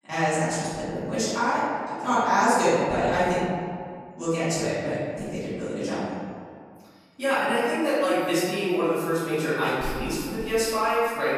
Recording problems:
room echo; strong; dies away in 1.6 s
off-mic speech; far
echo of what is said; noticeable; throughout; 270 ms later, 15 dB below the speech

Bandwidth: 14.5 kHz